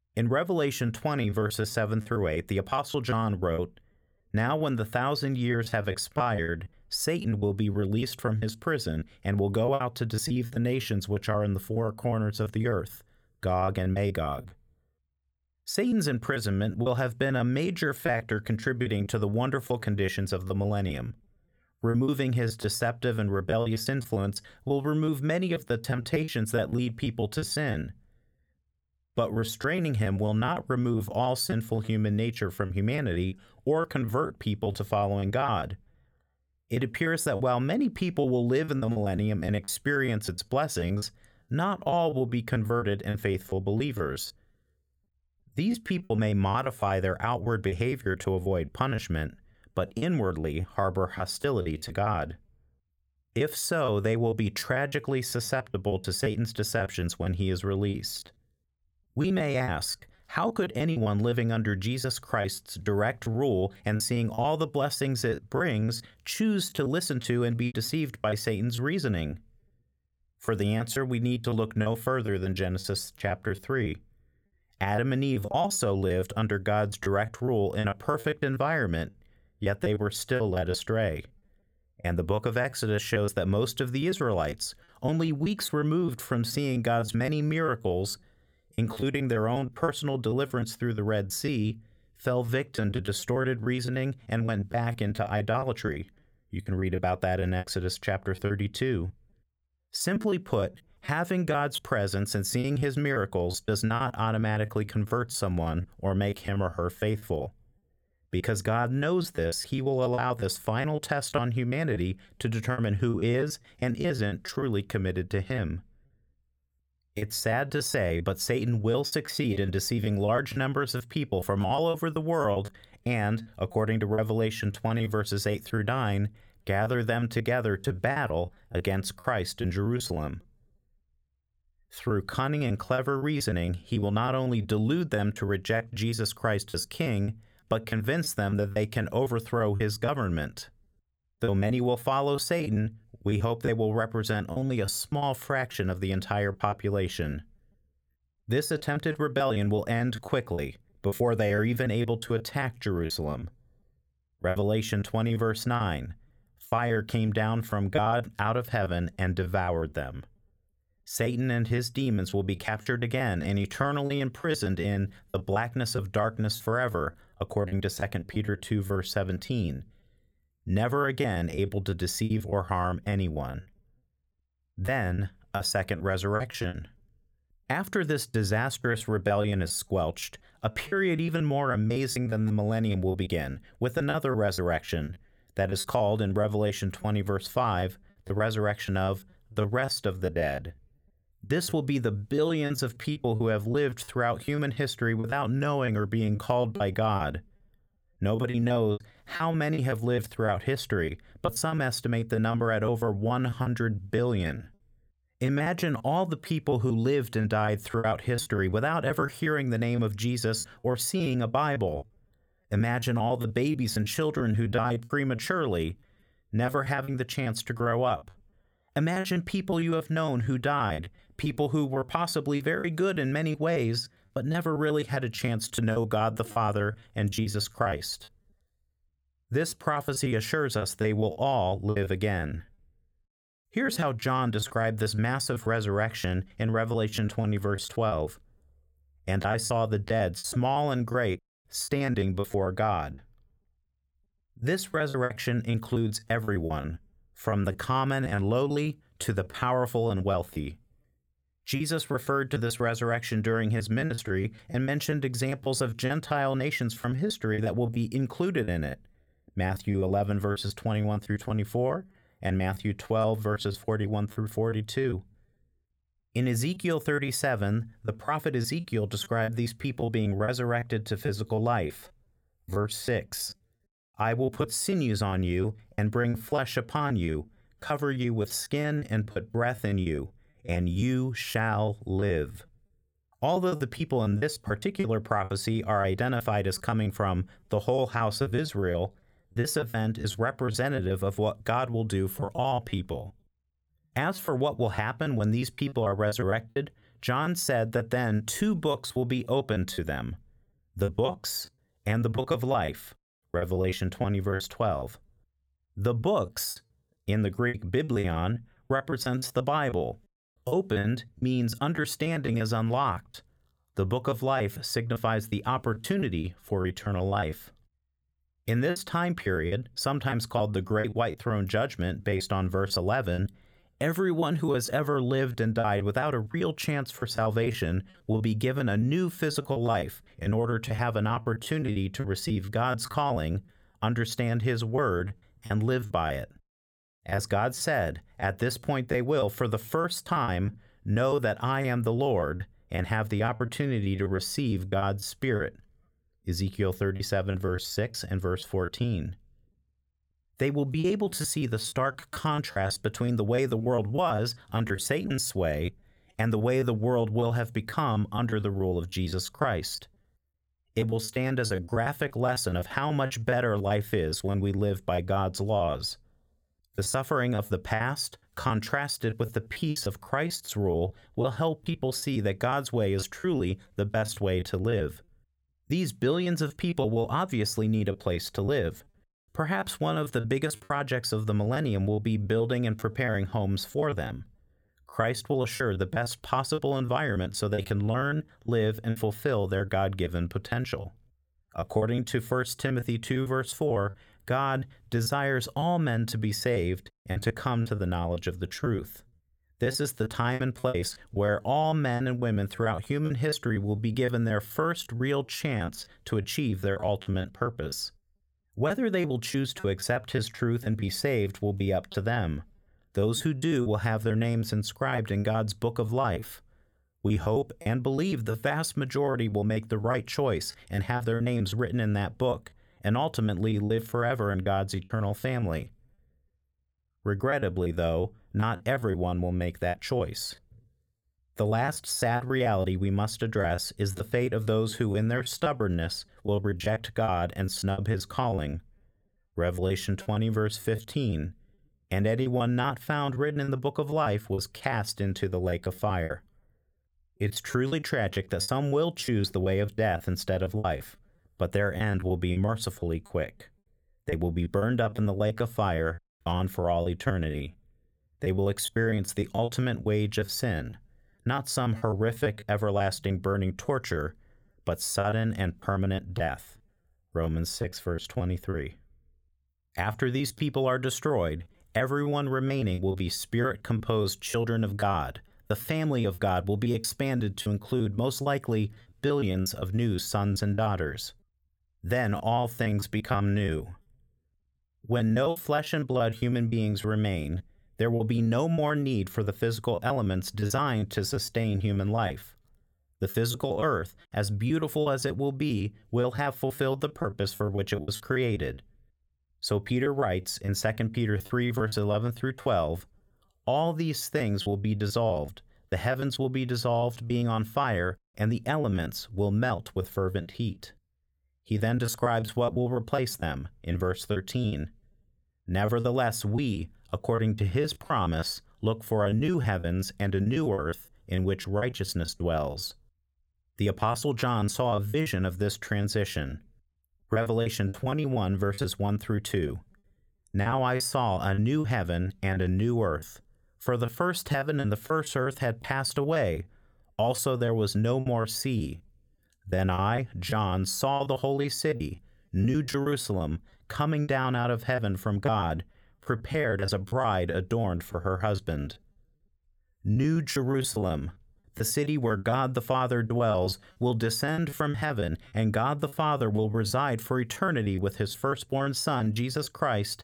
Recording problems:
choppy; very; 13% of the speech affected

